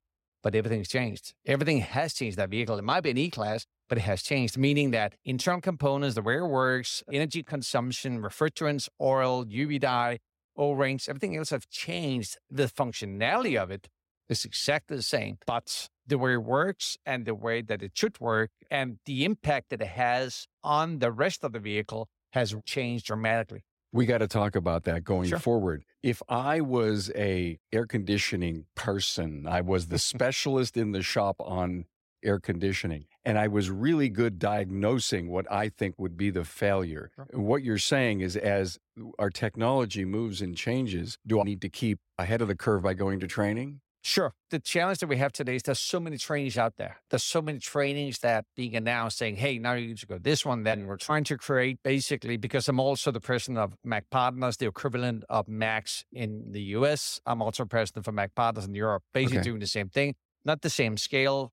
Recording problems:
none

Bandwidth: 16 kHz